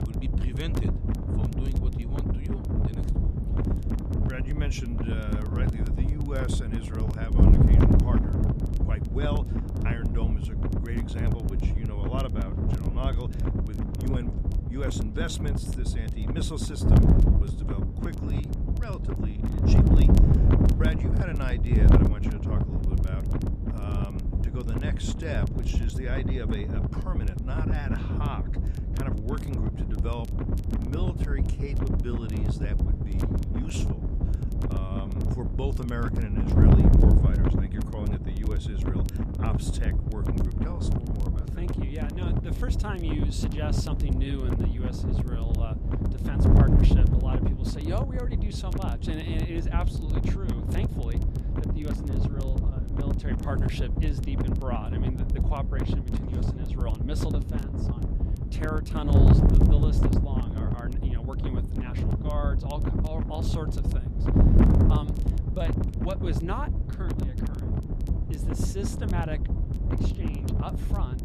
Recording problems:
wind noise on the microphone; heavy; 2 dB above the speech
crackle, like an old record; noticeable; 20 dB below the speech

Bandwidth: 14 kHz